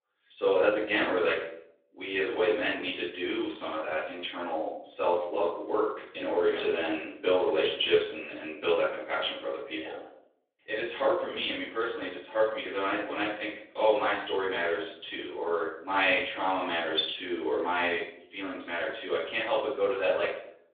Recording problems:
off-mic speech; far
room echo; noticeable; dies away in 0.6 s
thin; somewhat; fading below 300 Hz
phone-call audio

